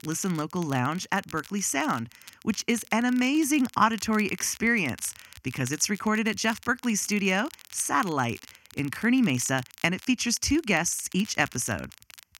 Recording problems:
crackle, like an old record; faint; 20 dB below the speech

